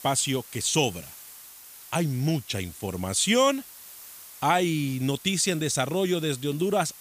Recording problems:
hiss; noticeable; throughout; 20 dB below the speech

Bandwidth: 15 kHz